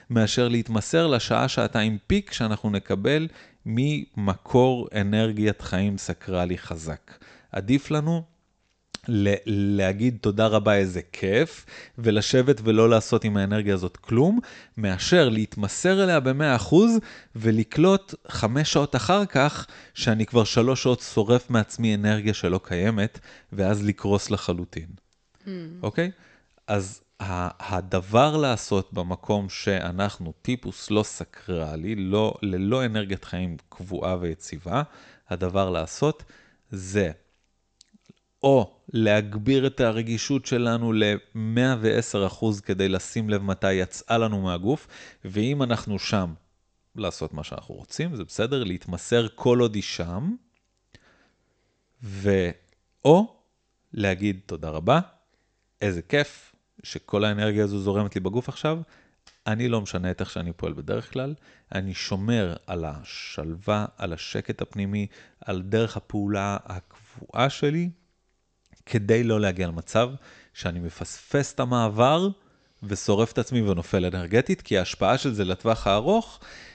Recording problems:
high frequencies cut off; noticeable; nothing above 8 kHz

